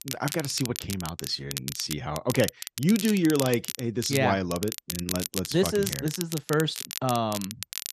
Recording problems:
crackle, like an old record; loud; 7 dB below the speech

